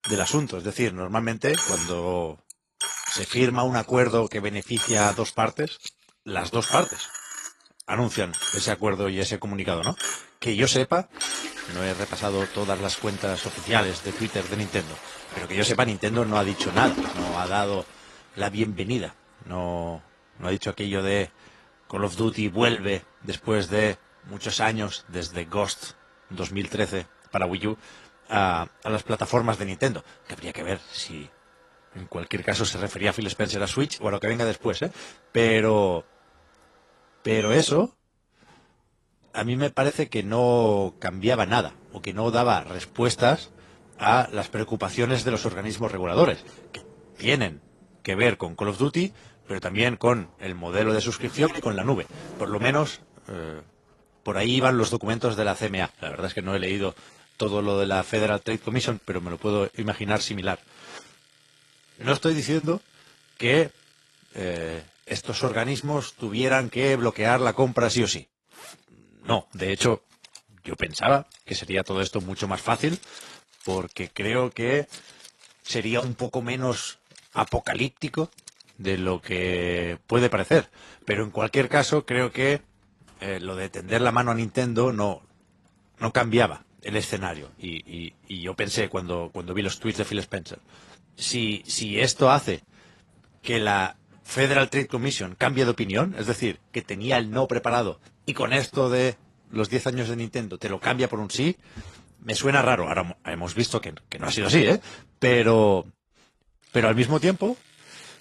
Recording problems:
garbled, watery; slightly
household noises; loud; throughout; 9 dB below the speech

